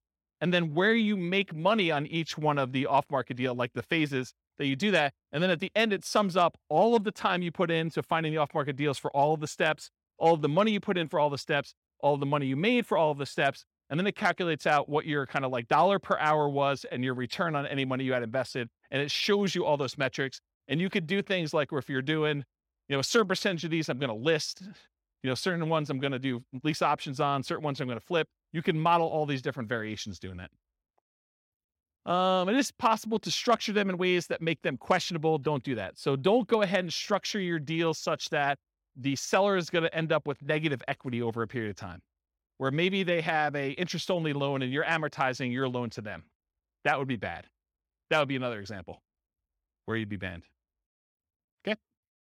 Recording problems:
none

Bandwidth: 16.5 kHz